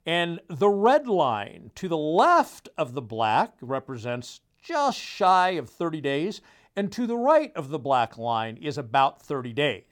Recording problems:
none

